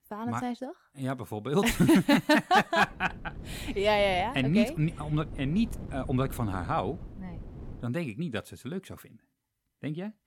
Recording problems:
wind noise on the microphone; occasional gusts; from 3 to 8 s; 25 dB below the speech

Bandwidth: 17 kHz